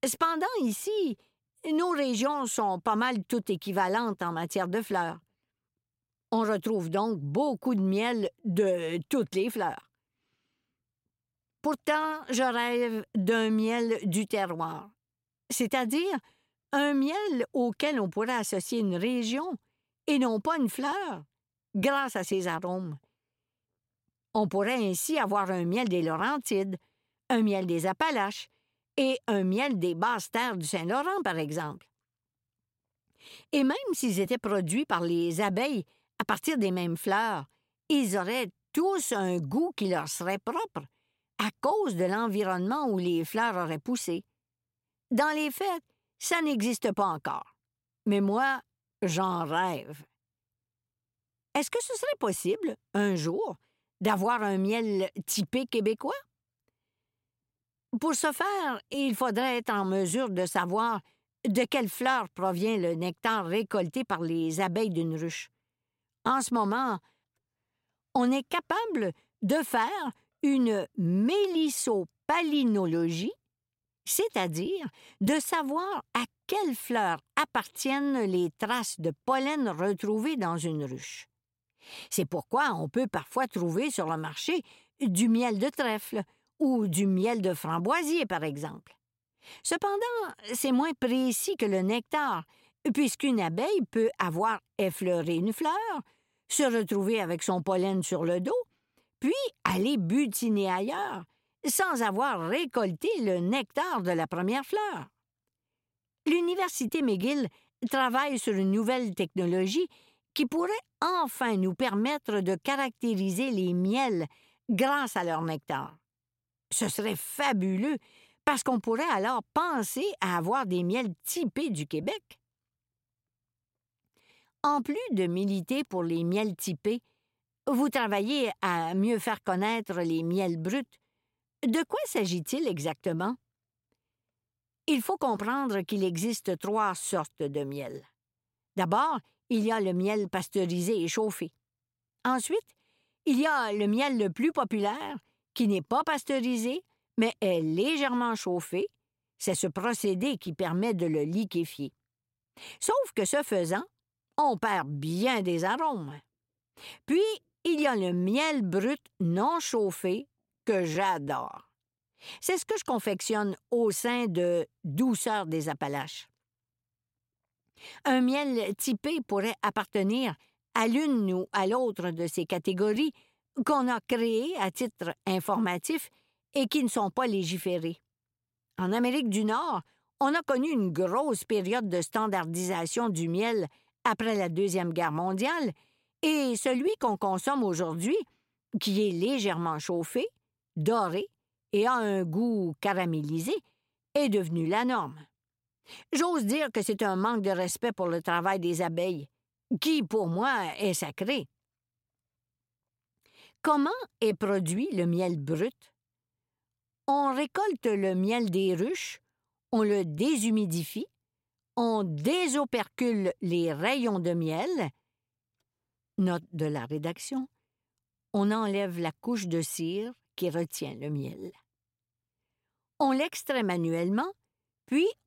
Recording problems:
none

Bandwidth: 16 kHz